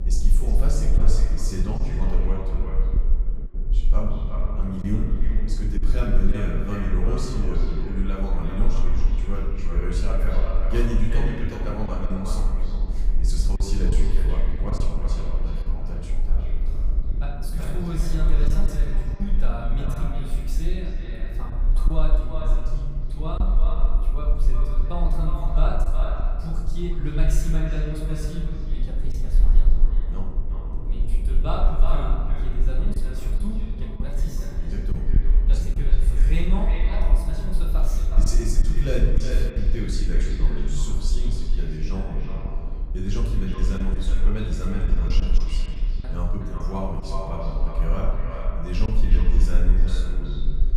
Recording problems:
echo of what is said; strong; throughout; 370 ms later, 8 dB below the speech
off-mic speech; far
room echo; noticeable; dies away in 0.9 s
wind noise on the microphone; occasional gusts; 15 dB below the speech
low rumble; noticeable; throughout; 15 dB below the speech
choppy; occasionally; 3% of the speech affected

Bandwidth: 15.5 kHz